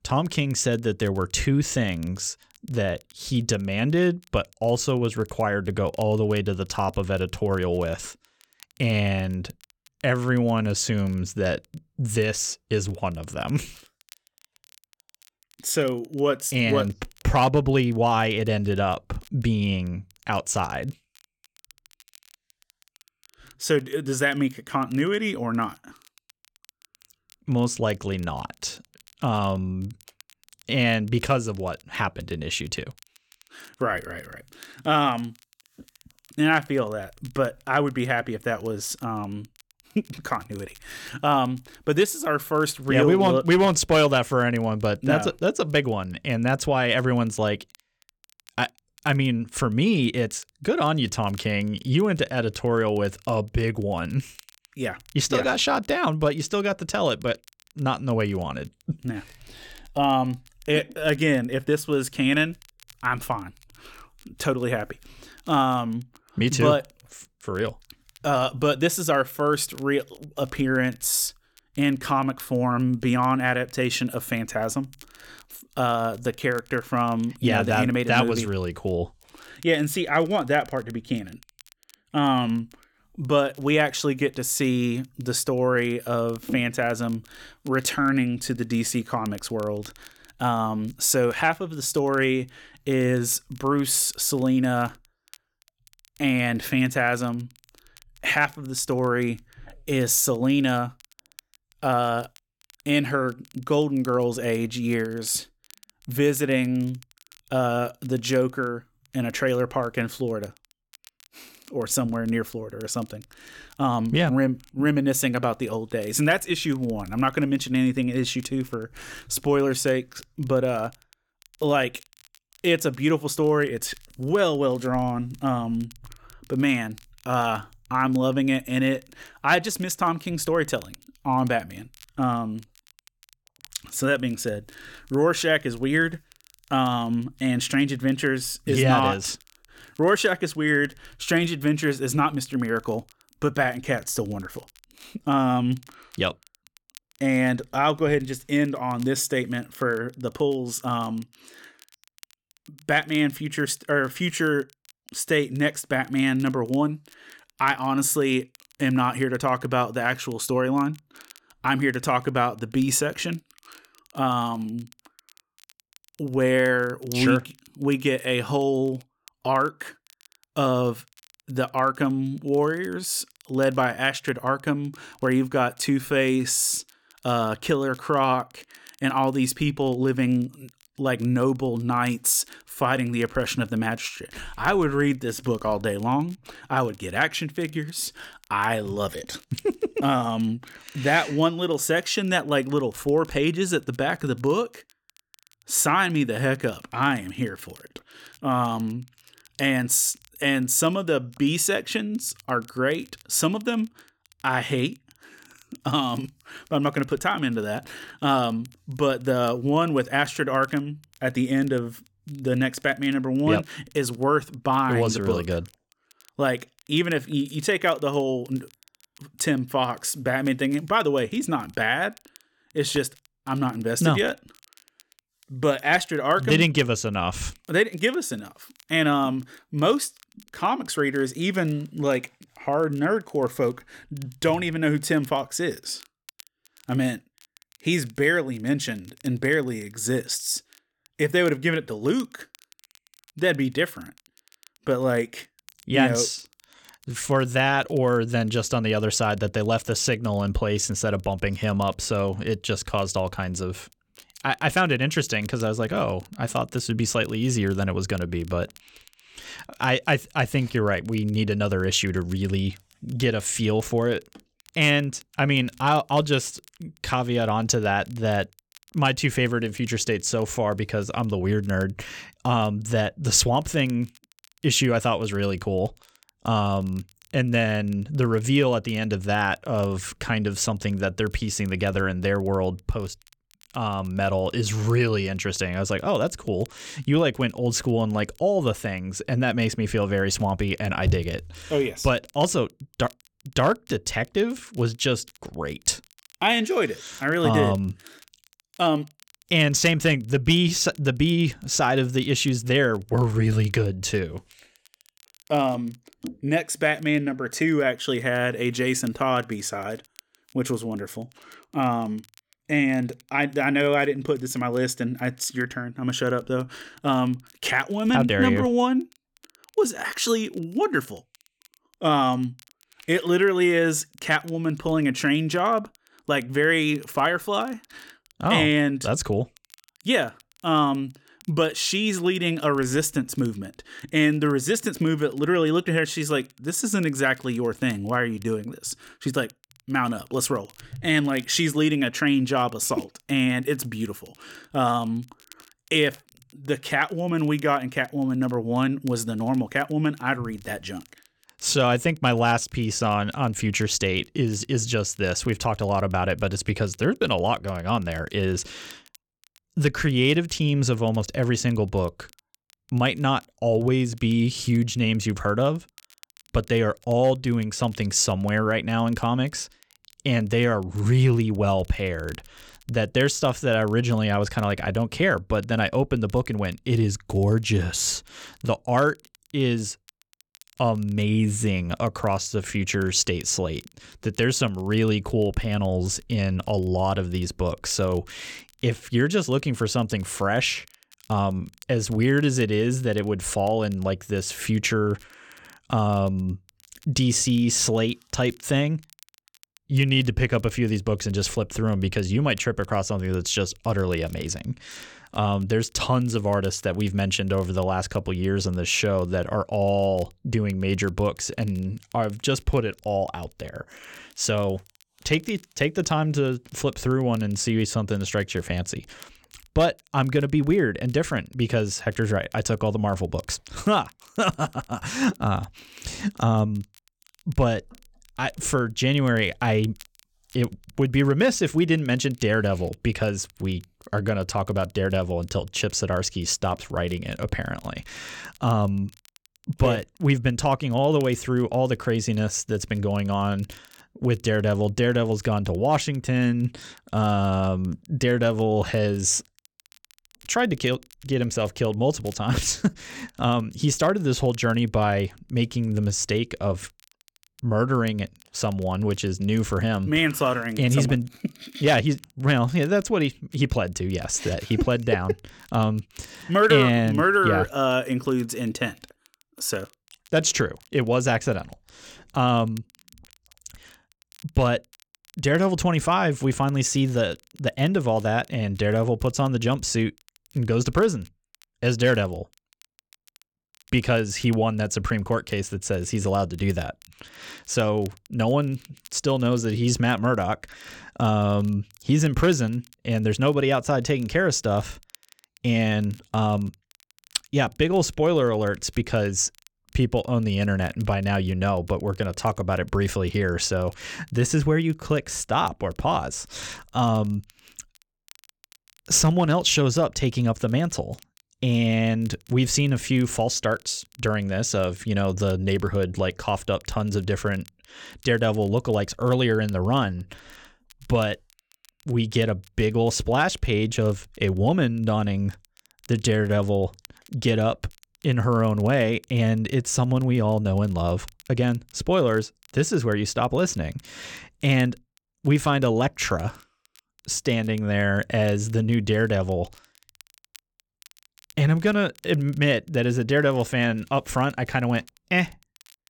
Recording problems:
crackle, like an old record; faint; 30 dB below the speech

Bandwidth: 18 kHz